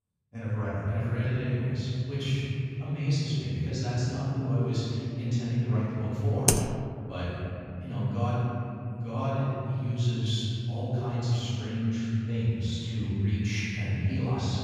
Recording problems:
room echo; strong; dies away in 3 s
off-mic speech; far
keyboard typing; loud; at 6.5 s; peak 5 dB above the speech

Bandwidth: 15 kHz